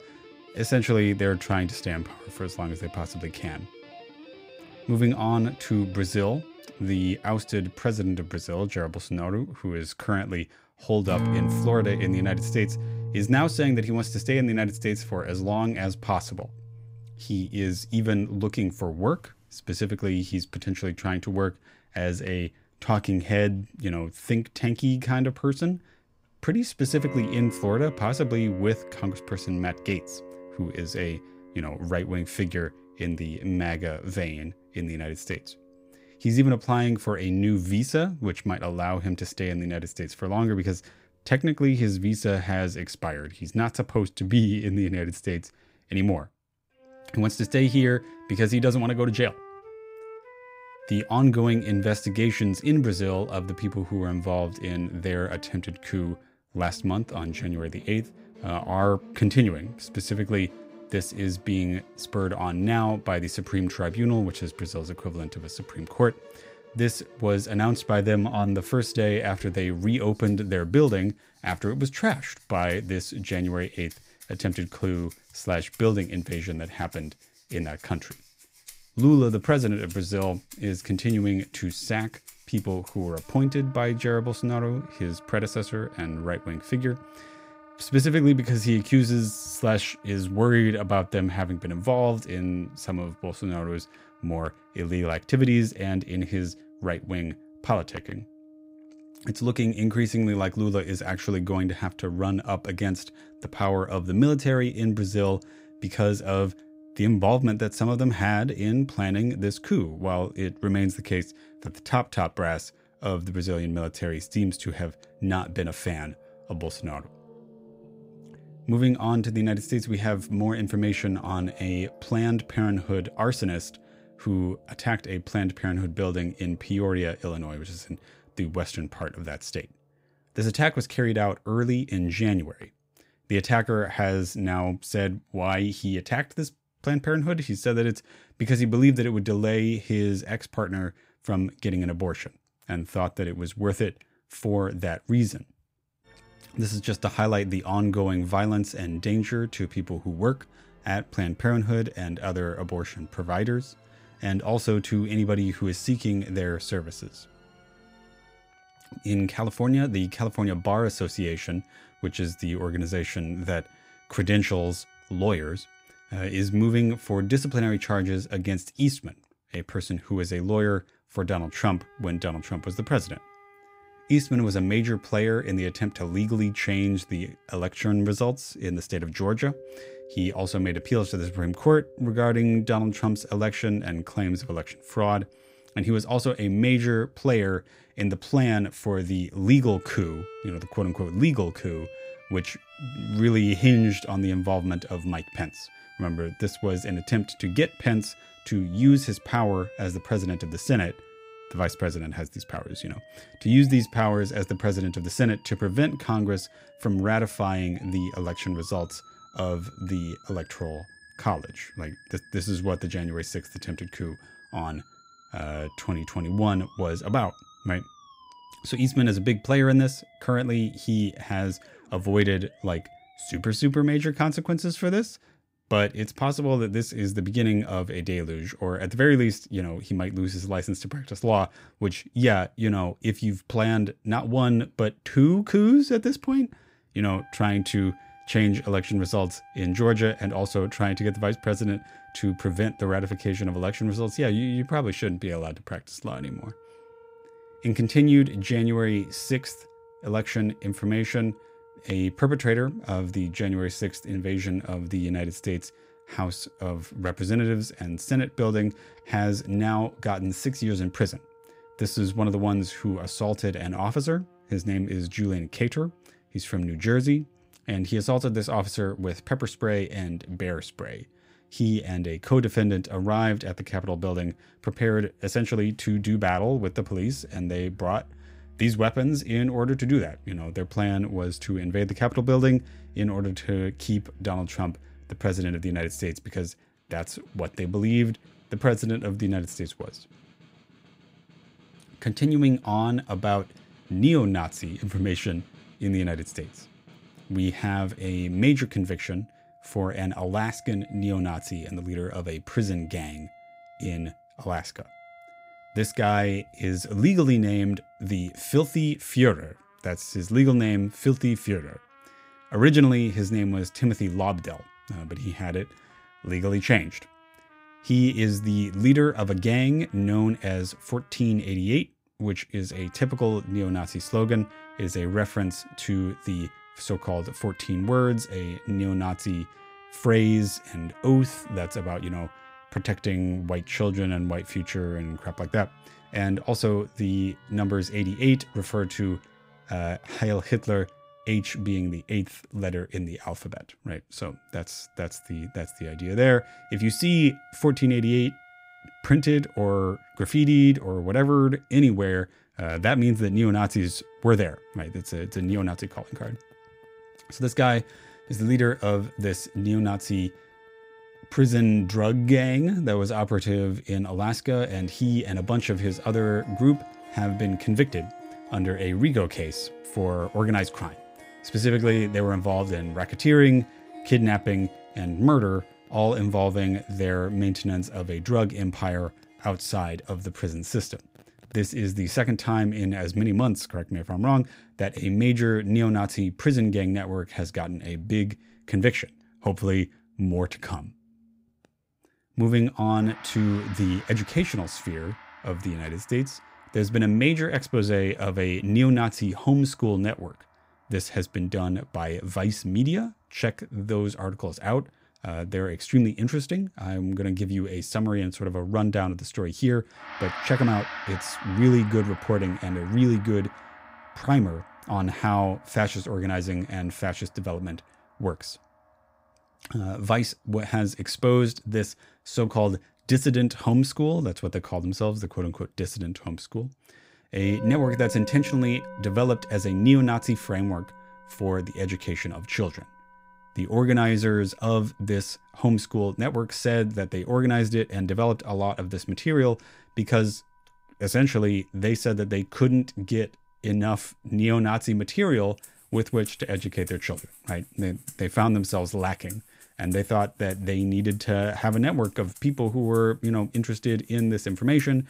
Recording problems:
background music; noticeable; throughout; 20 dB below the speech

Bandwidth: 15.5 kHz